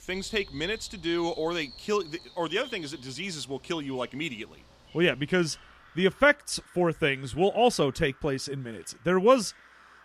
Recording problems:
animal sounds; faint; throughout; 20 dB below the speech

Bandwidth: 15 kHz